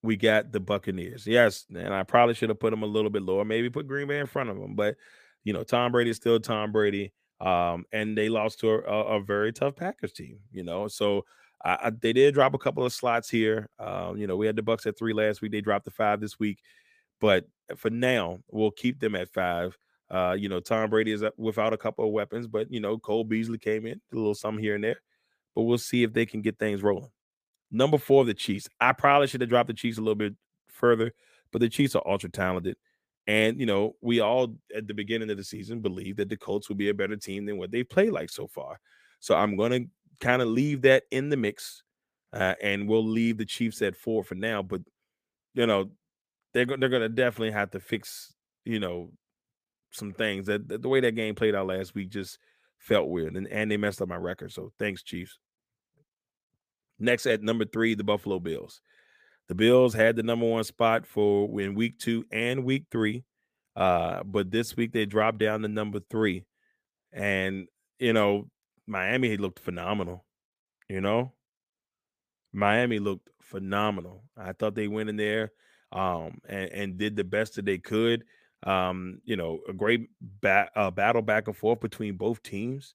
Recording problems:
none

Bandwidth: 15 kHz